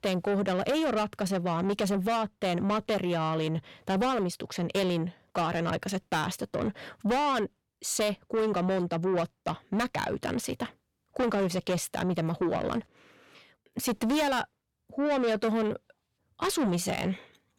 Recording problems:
distortion; heavy; 7 dB below the speech

